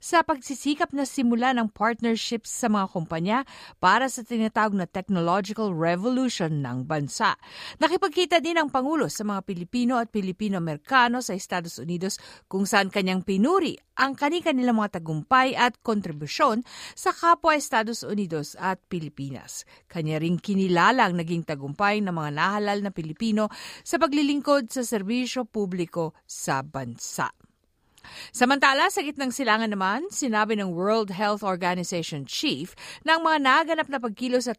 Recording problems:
none

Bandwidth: 15 kHz